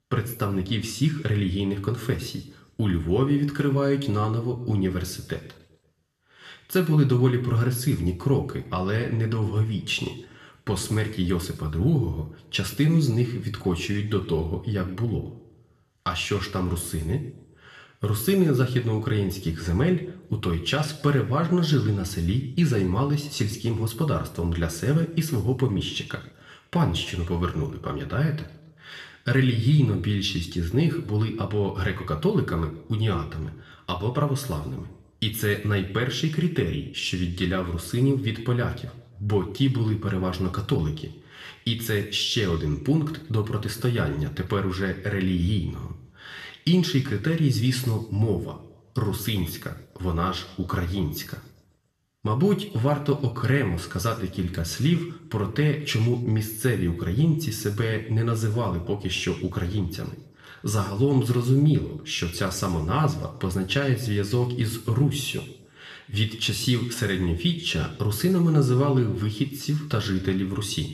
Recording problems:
room echo; slight; dies away in 0.7 s
off-mic speech; somewhat distant

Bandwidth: 13.5 kHz